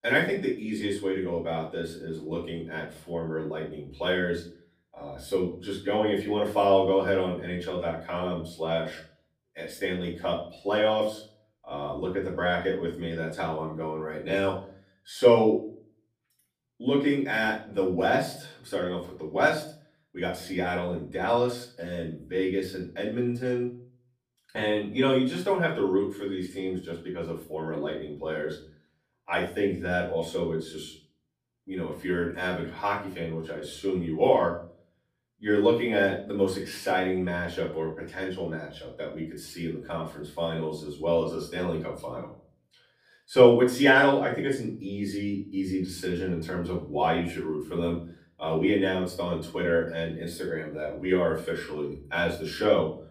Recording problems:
off-mic speech; far
room echo; slight; dies away in 0.4 s

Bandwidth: 15 kHz